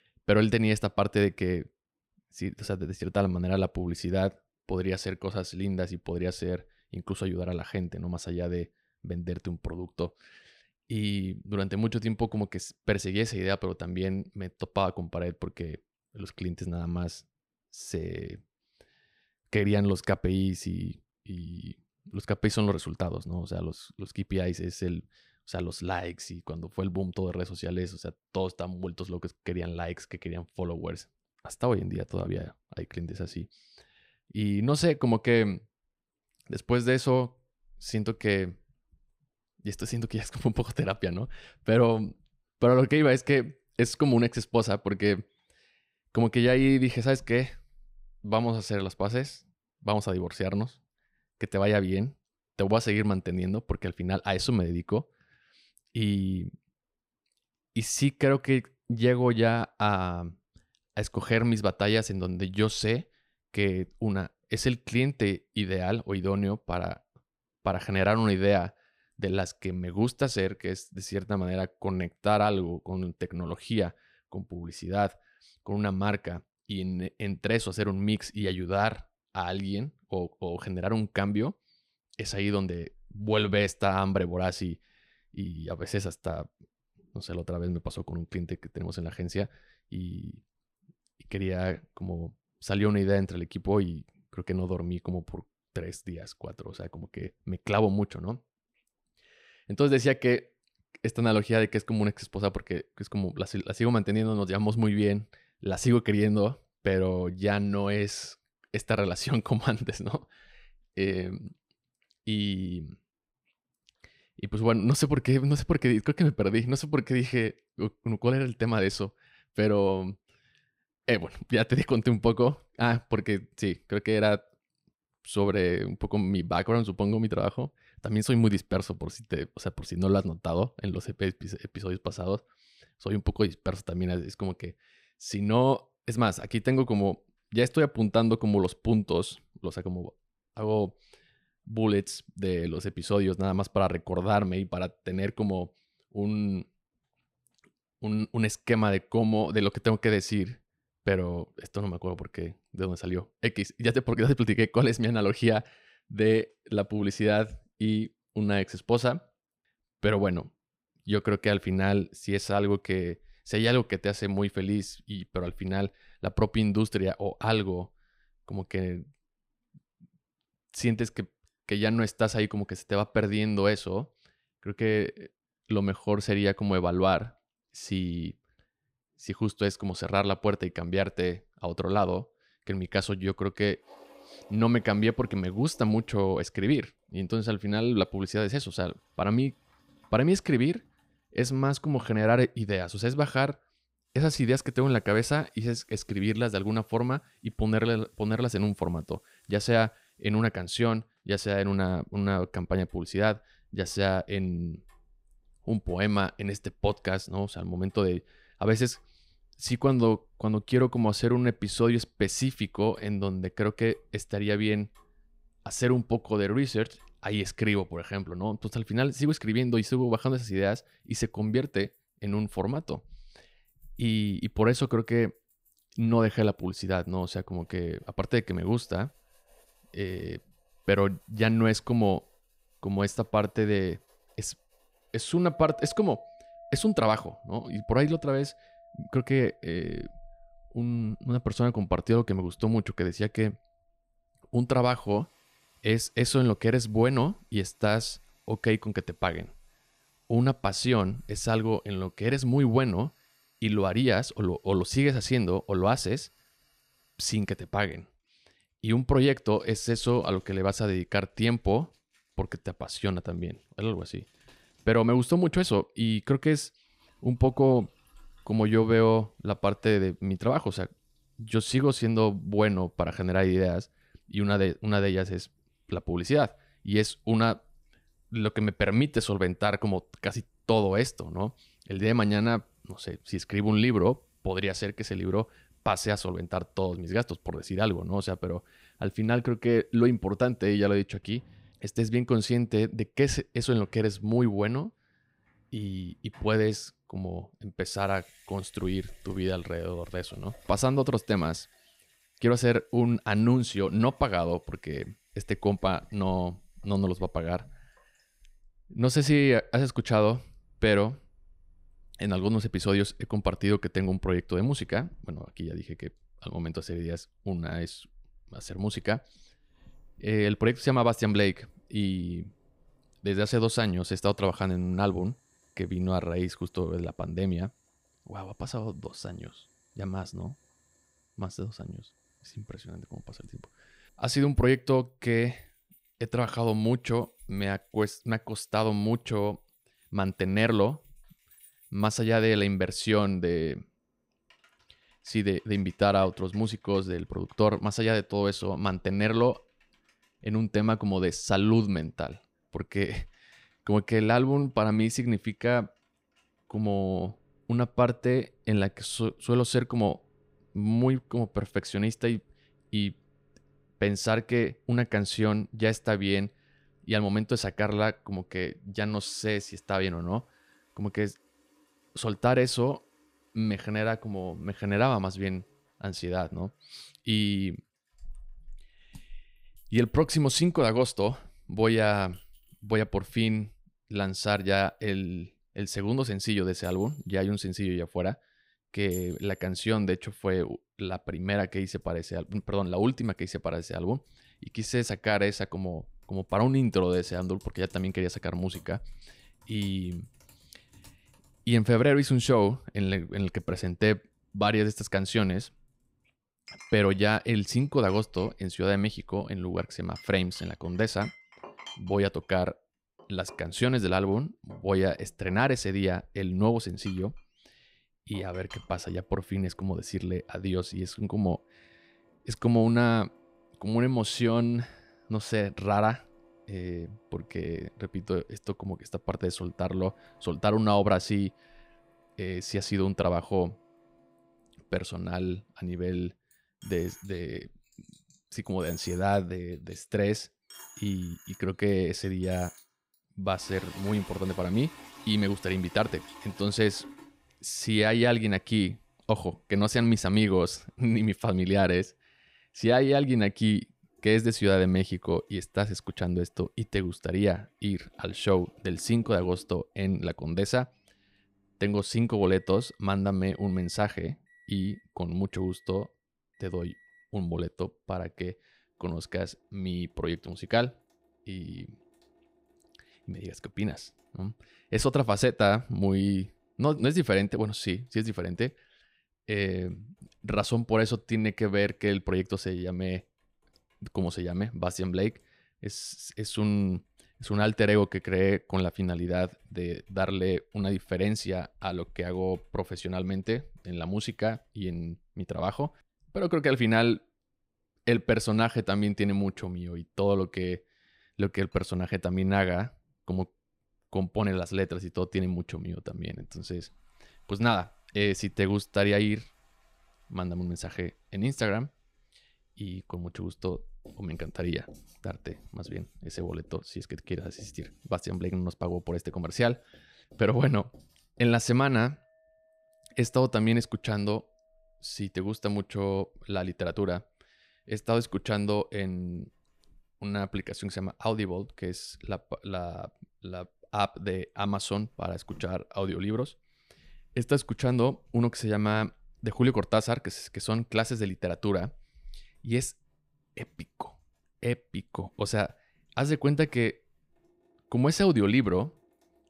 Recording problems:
household noises; faint; from 3:04 on; 30 dB below the speech

